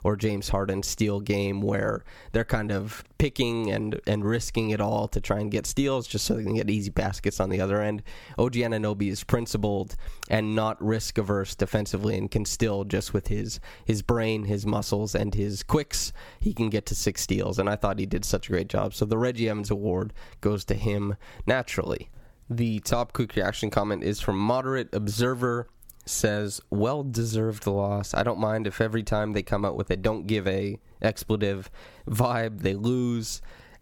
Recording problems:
squashed, flat; somewhat

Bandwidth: 17.5 kHz